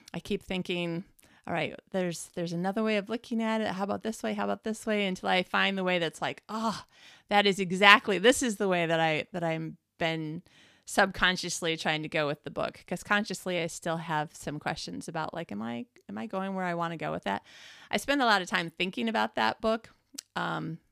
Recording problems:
none

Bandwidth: 15 kHz